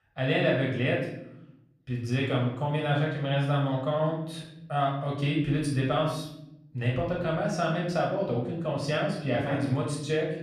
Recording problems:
off-mic speech; far
room echo; noticeable; dies away in 0.7 s

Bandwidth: 15 kHz